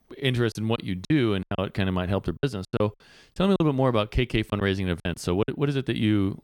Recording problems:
choppy; very; from 0.5 to 1.5 s, from 2.5 to 3.5 s and at 4.5 s; 16% of the speech affected

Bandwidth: 18 kHz